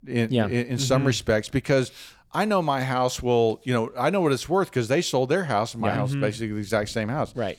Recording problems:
none

